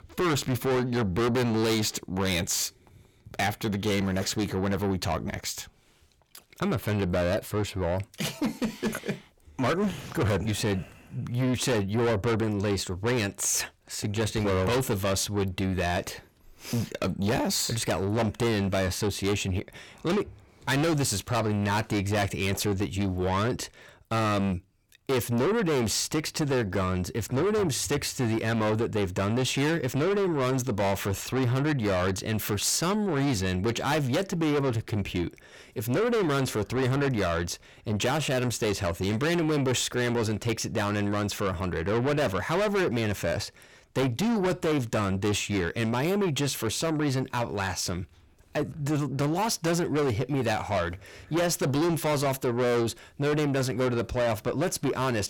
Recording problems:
distortion; heavy; 6 dB below the speech

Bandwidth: 17.5 kHz